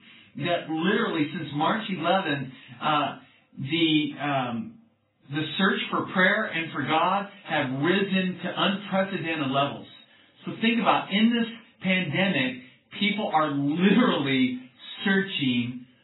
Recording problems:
off-mic speech; far
garbled, watery; badly; nothing above 4 kHz
room echo; very slight; dies away in 0.2 s

